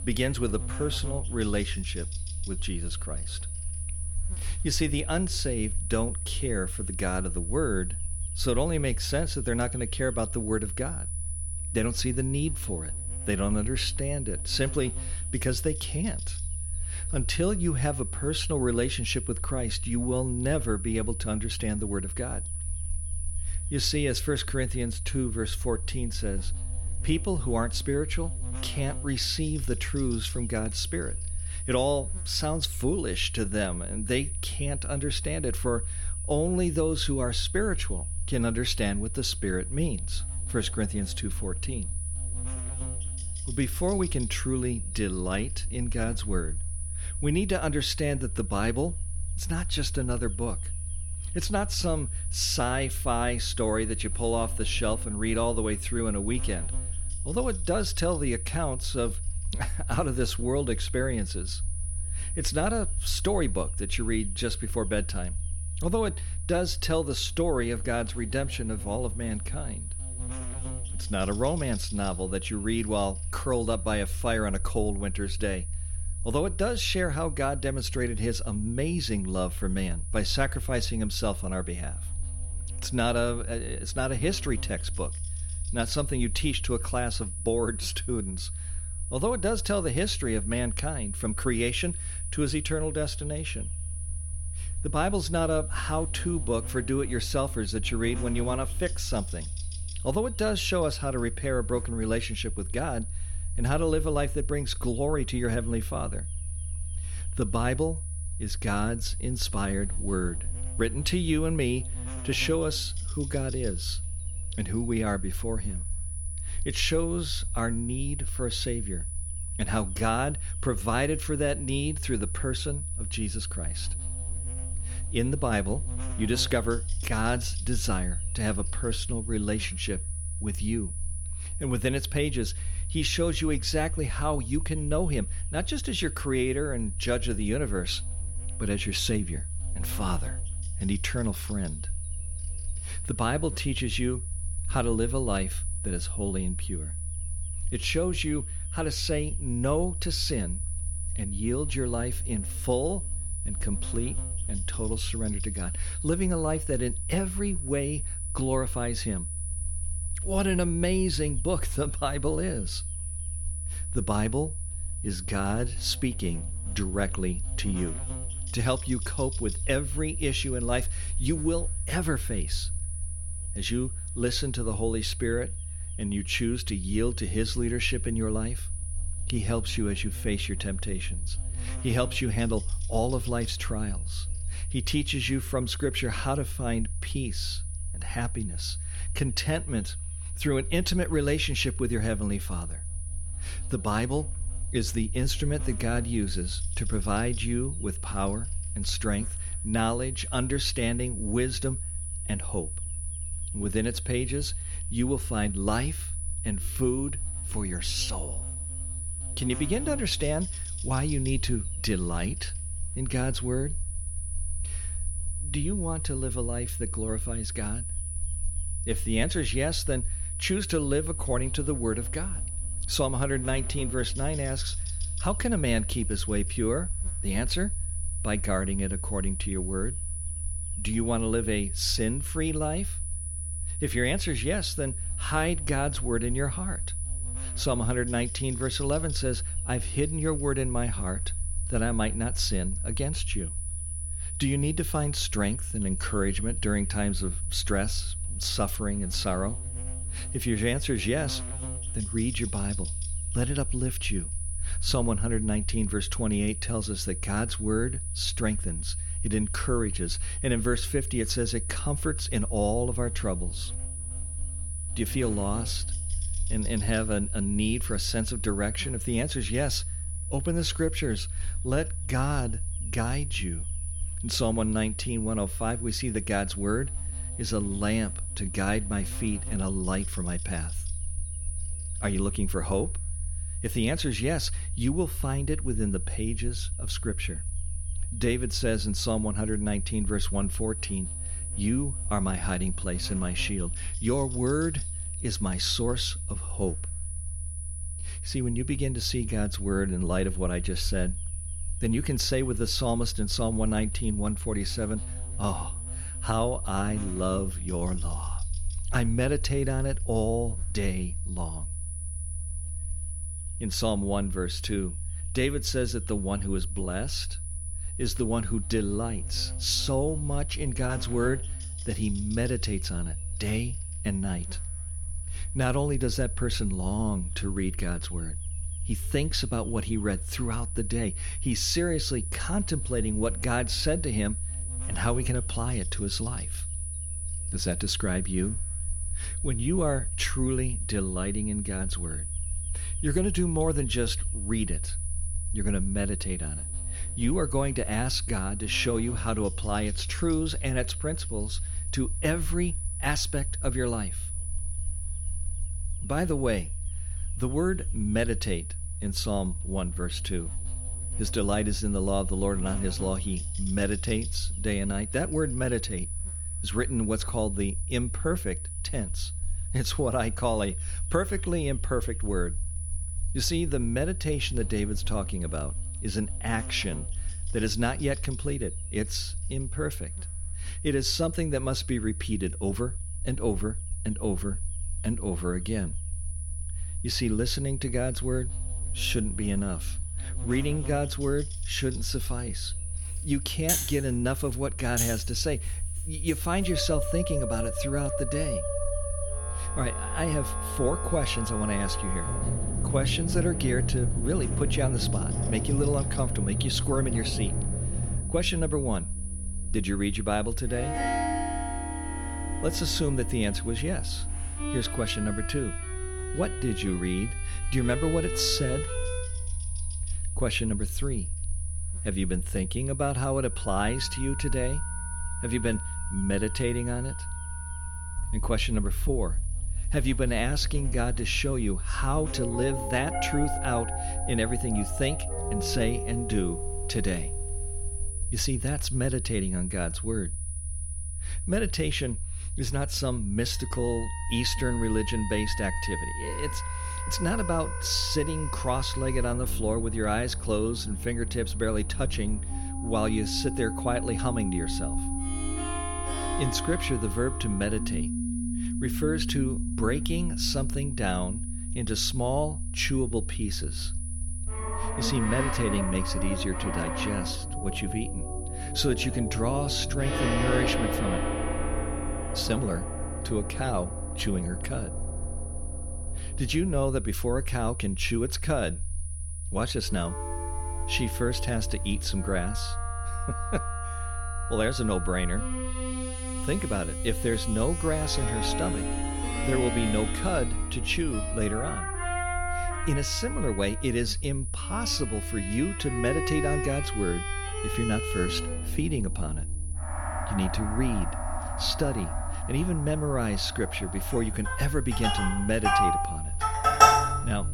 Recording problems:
high-pitched whine; loud; throughout; 10 kHz, 8 dB below the speech
background music; loud; from 6:33 on; 4 dB below the speech
electrical hum; faint; until 7:12; 50 Hz, 20 dB below the speech
low rumble; faint; throughout; 25 dB below the speech

